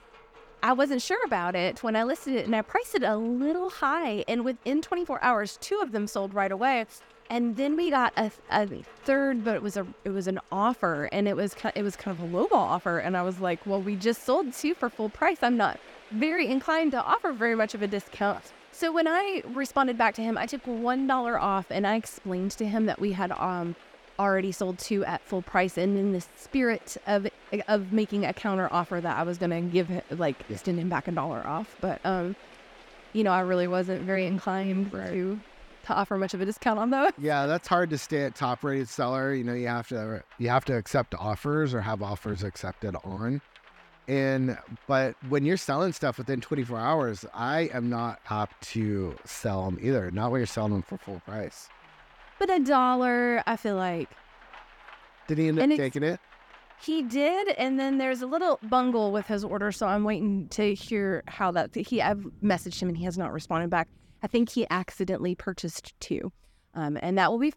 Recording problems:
rain or running water; faint; throughout; 25 dB below the speech

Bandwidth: 17.5 kHz